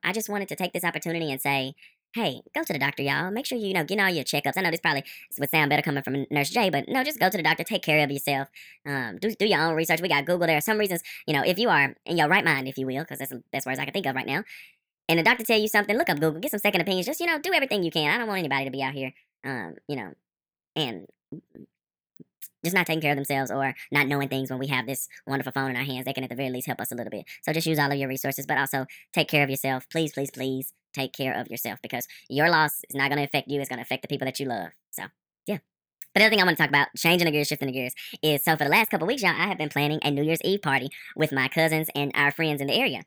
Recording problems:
wrong speed and pitch; too fast and too high; 1.5 times normal speed

